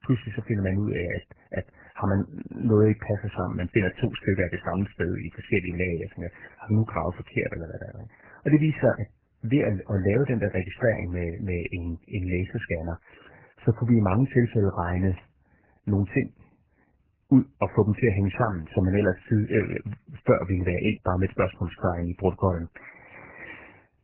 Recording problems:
garbled, watery; badly; nothing above 3 kHz

